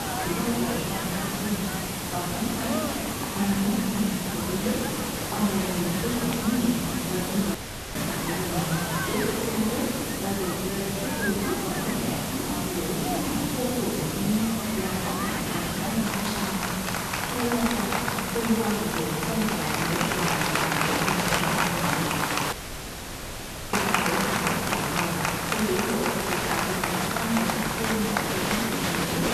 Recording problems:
room echo; strong; dies away in 1.5 s
off-mic speech; far
crowd noise; loud; throughout; as loud as the speech
hiss; loud; throughout; 1 dB below the speech
audio cutting out; at 7.5 s and at 23 s for 1 s

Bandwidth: 13.5 kHz